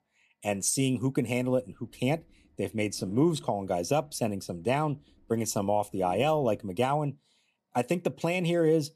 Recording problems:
low rumble; faint; from 1 to 6.5 s; 25 dB below the speech

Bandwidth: 13.5 kHz